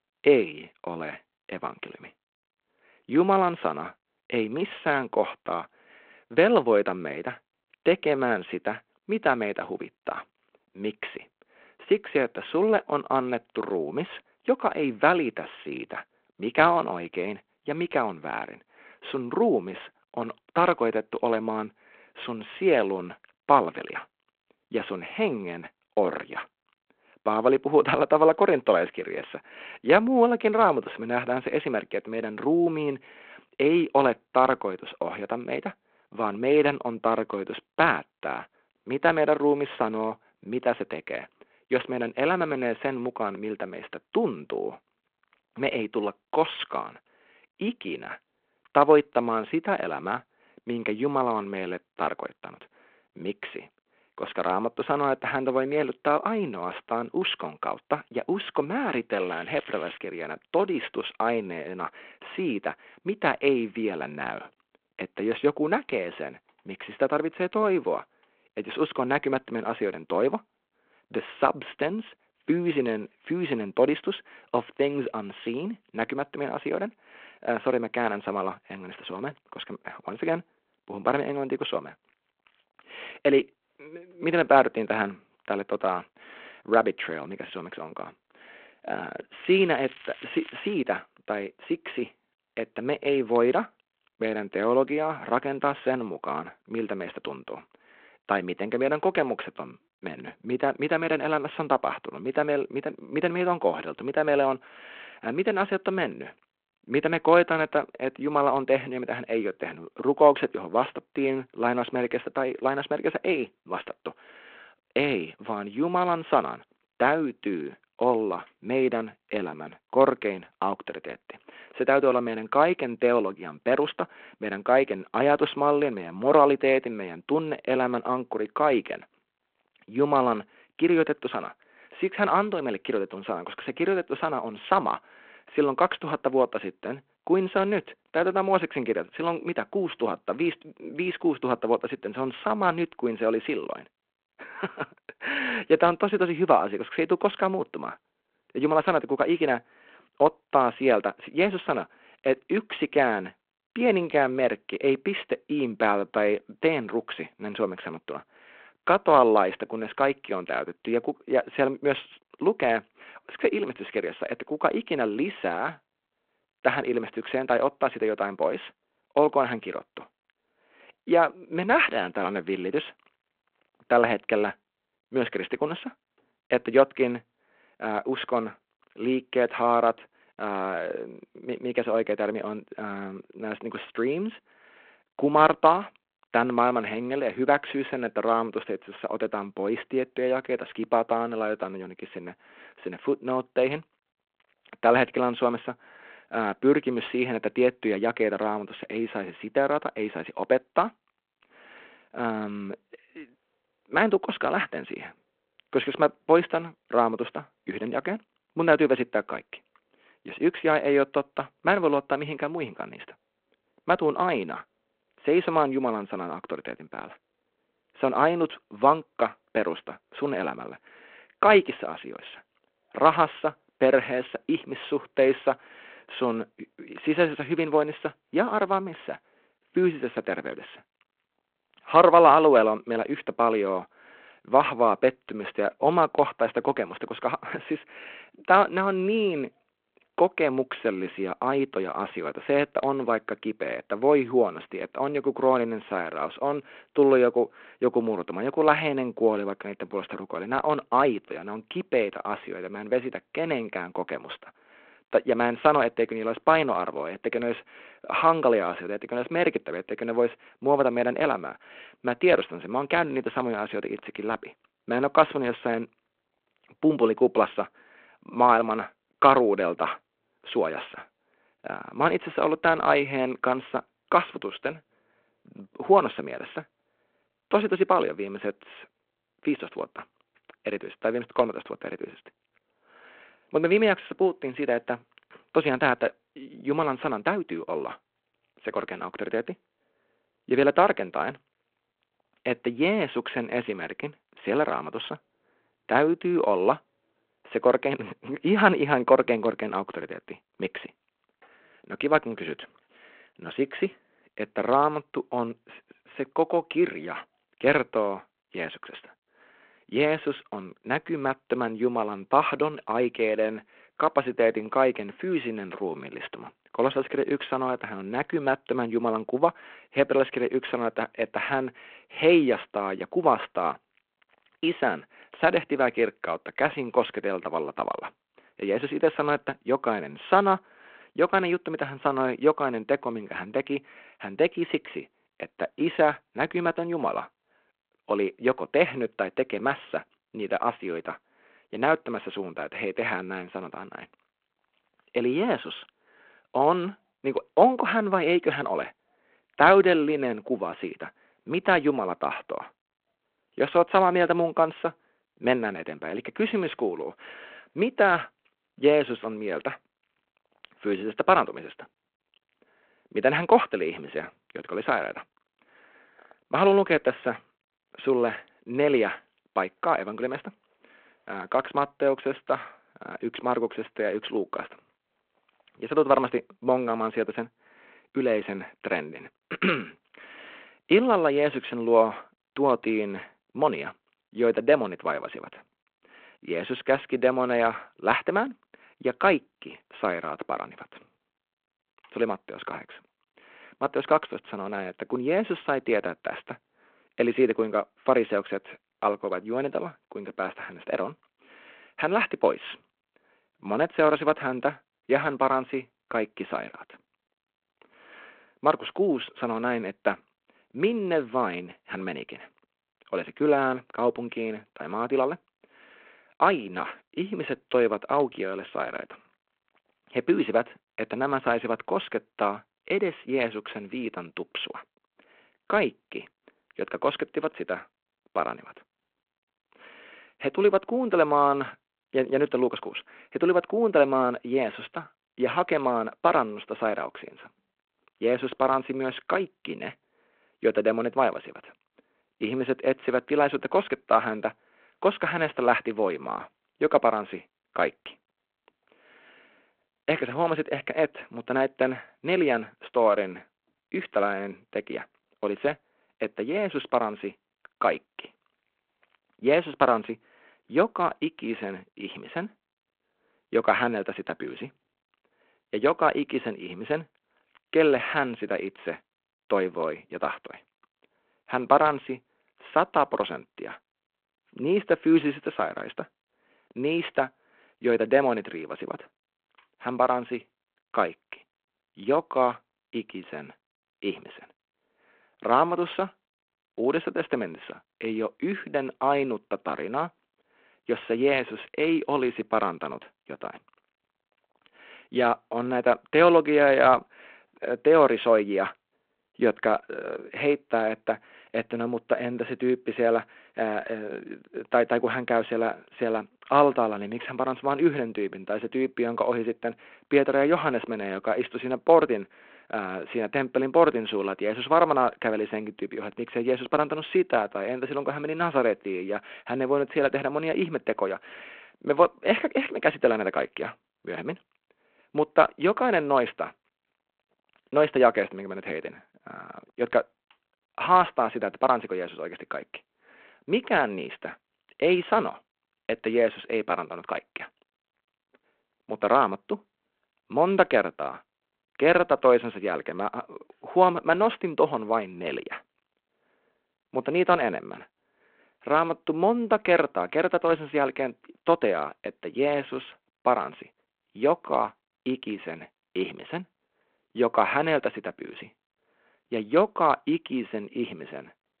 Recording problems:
phone-call audio
crackling; noticeable; at 59 s and from 1:29 to 1:31; 20 dB below the speech

